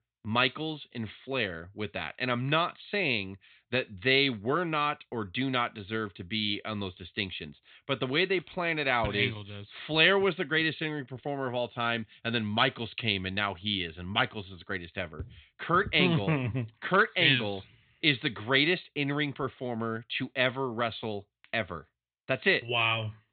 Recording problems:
high frequencies cut off; severe; nothing above 4 kHz

